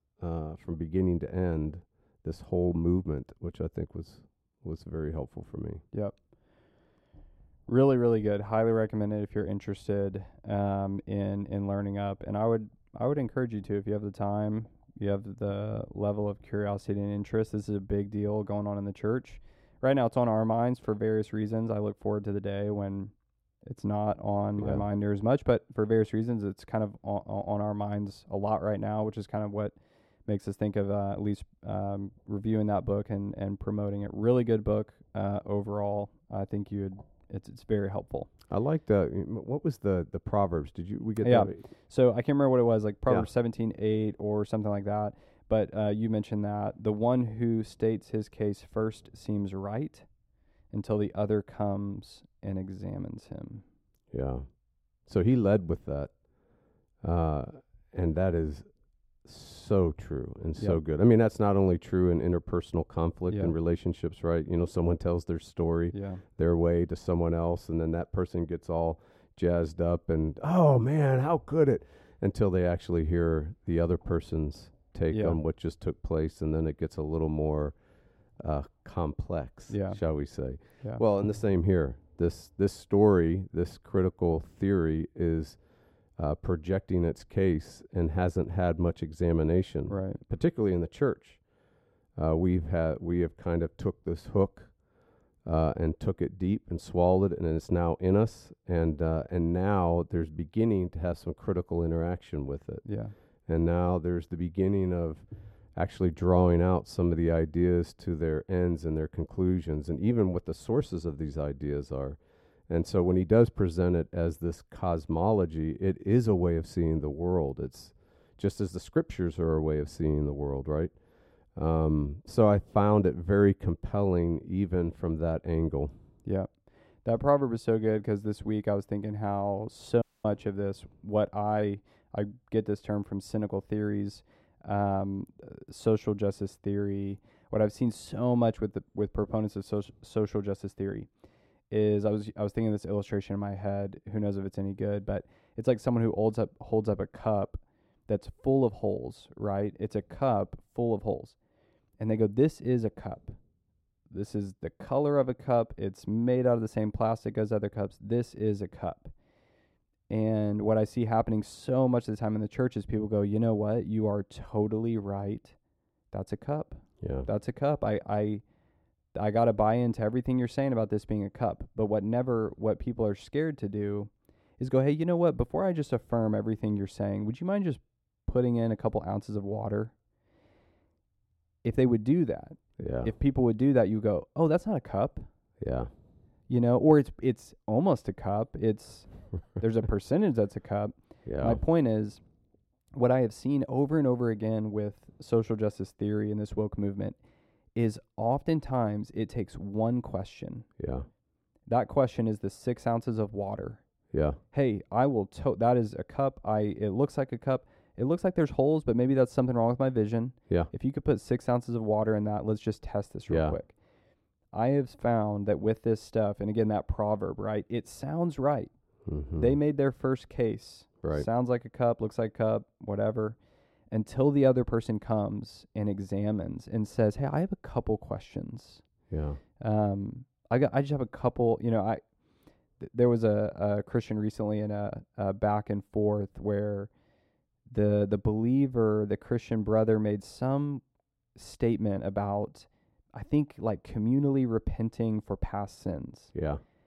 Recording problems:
muffled; slightly; fading above 1.5 kHz
audio cutting out; at 2:10

